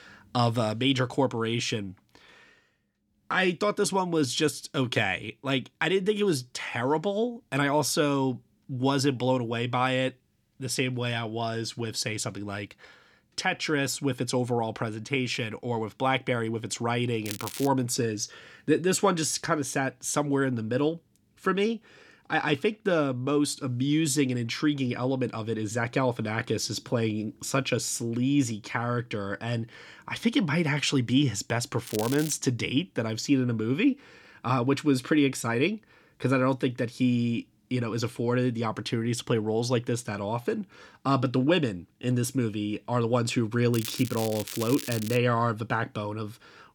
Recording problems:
crackling; noticeable; at 17 s, at 32 s and from 44 to 45 s; 10 dB below the speech

